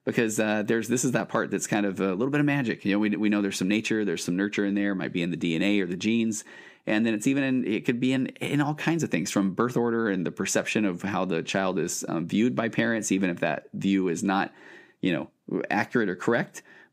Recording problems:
none

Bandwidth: 15 kHz